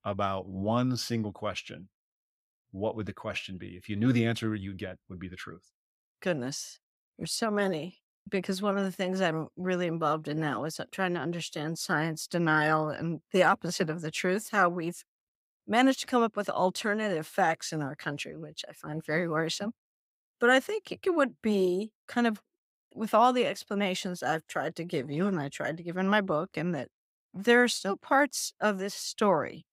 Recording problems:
none

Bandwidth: 15.5 kHz